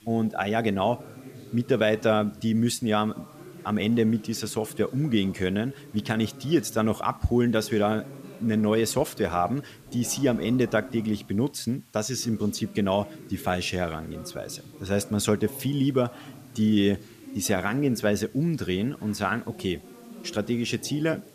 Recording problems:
voice in the background; noticeable; throughout; 20 dB below the speech
hiss; faint; throughout; 30 dB below the speech

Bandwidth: 14.5 kHz